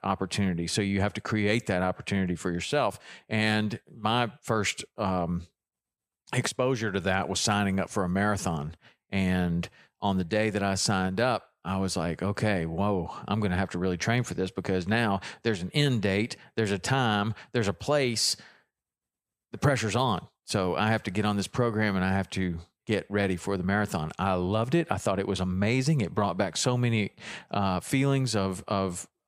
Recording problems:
none

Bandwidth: 14.5 kHz